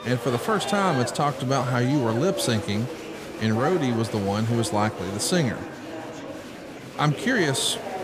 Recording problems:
murmuring crowd; loud; throughout; 9 dB below the speech

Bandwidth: 15 kHz